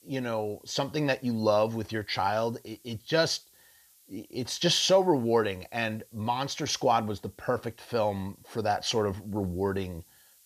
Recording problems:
hiss; faint; throughout; 30 dB below the speech

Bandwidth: 14.5 kHz